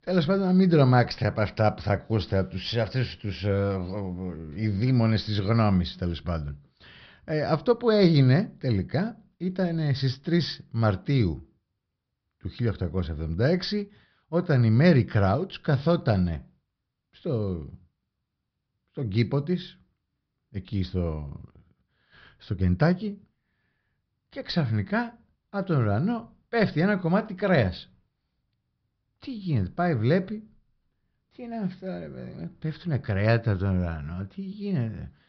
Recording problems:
high frequencies cut off; noticeable; nothing above 5.5 kHz

